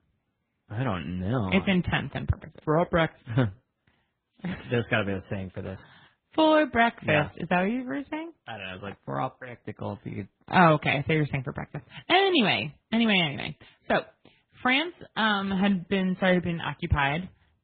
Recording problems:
garbled, watery; badly
high frequencies cut off; severe; nothing above 4 kHz

